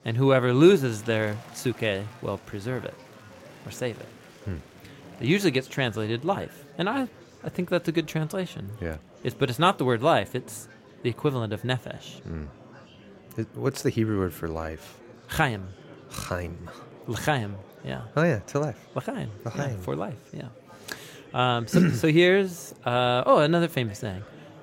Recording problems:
murmuring crowd; faint; throughout; 20 dB below the speech

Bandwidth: 16 kHz